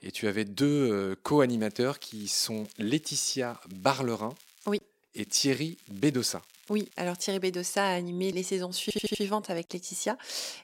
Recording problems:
crackling; faint; from 1.5 to 4.5 s and from 5 to 7.5 s; 25 dB below the speech
audio stuttering; at 9 s

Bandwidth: 16 kHz